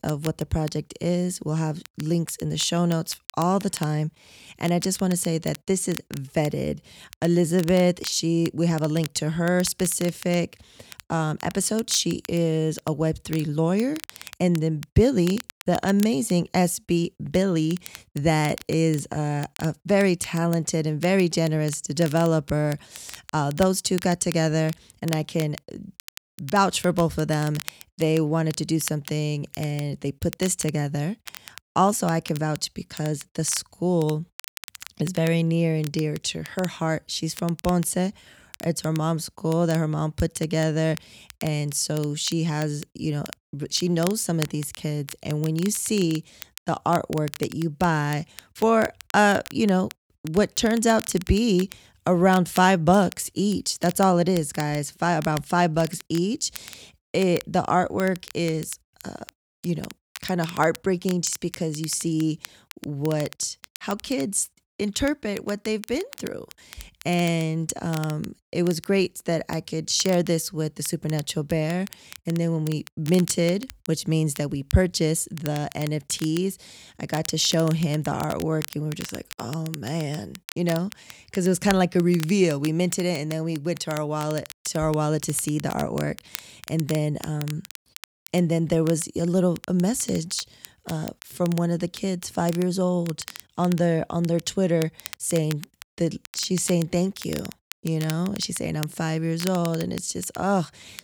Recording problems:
crackle, like an old record; noticeable; 15 dB below the speech

